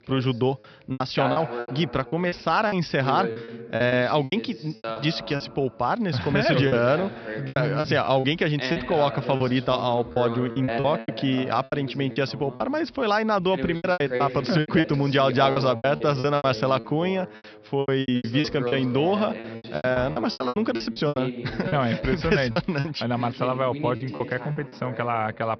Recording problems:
high frequencies cut off; noticeable; nothing above 5.5 kHz
voice in the background; loud; throughout; 10 dB below the speech
choppy; very; 12% of the speech affected

